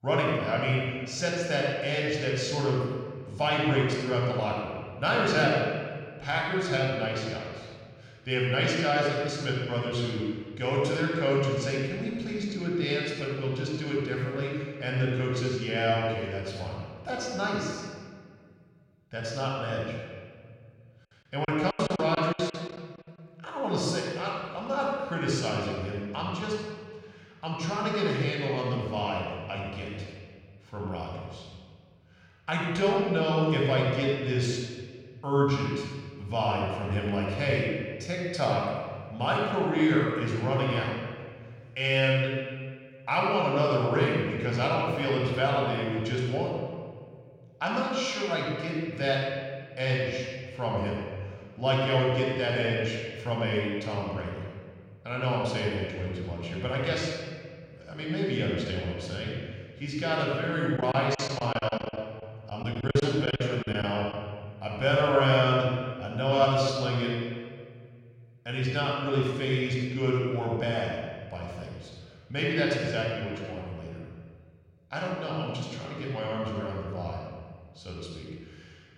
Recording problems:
room echo; strong; dies away in 1.6 s
off-mic speech; far
echo of what is said; faint; throughout; 210 ms later, 20 dB below the speech
choppy; very; at 21 s and from 1:01 to 1:04; 18% of the speech affected

